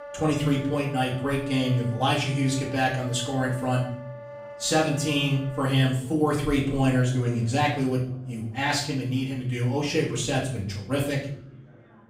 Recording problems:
off-mic speech; far
room echo; slight; dies away in 0.5 s
background music; noticeable; throughout; 15 dB below the speech
chatter from many people; faint; throughout; 30 dB below the speech

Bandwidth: 15.5 kHz